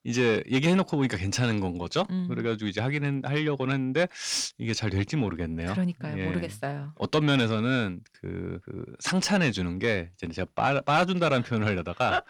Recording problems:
distortion; slight; 10 dB below the speech

